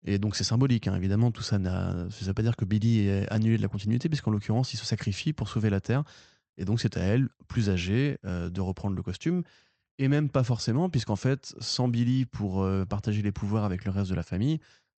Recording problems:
high frequencies cut off; noticeable; nothing above 8 kHz

